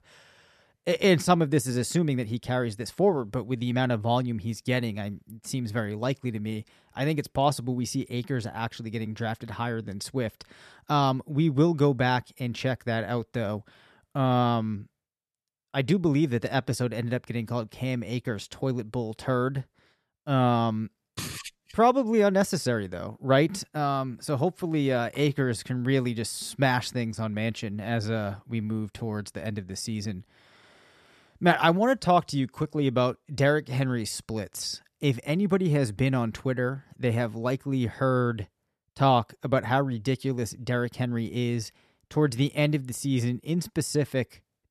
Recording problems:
none

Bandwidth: 13.5 kHz